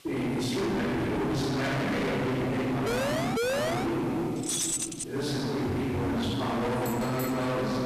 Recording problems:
distortion; heavy; 49% of the sound clipped
room echo; strong; dies away in 2.2 s
off-mic speech; far
traffic noise; very faint; throughout; 10 dB below the speech
hiss; very faint; throughout; 25 dB below the speech
siren; loud; from 3 to 4 s; peak 3 dB above the speech
jangling keys; loud; at 4.5 s; peak 2 dB above the speech
phone ringing; noticeable; at 5.5 s; peak 6 dB below the speech

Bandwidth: 14 kHz